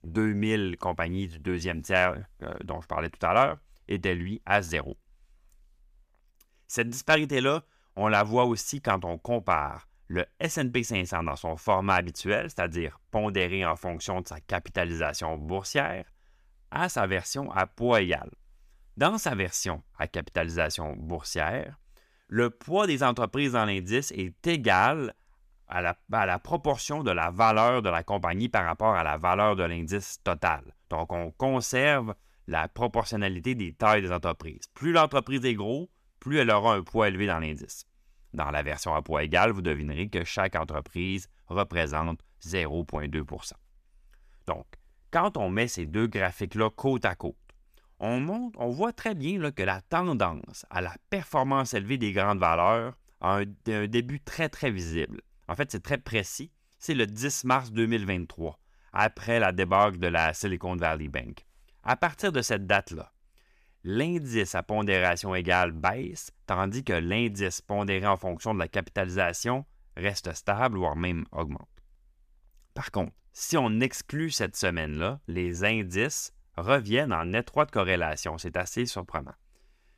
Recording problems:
none

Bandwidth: 14.5 kHz